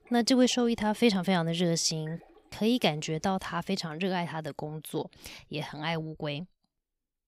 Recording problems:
rain or running water; faint; until 4 s; 30 dB below the speech

